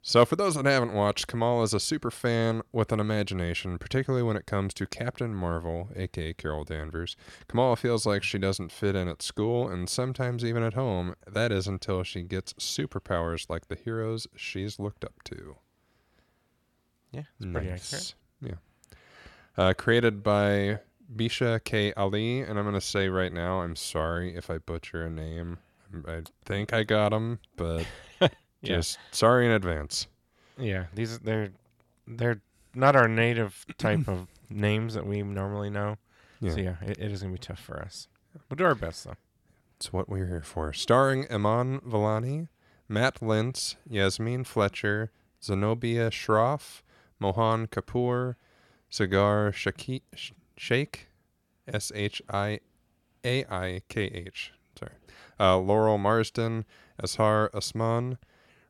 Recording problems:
none

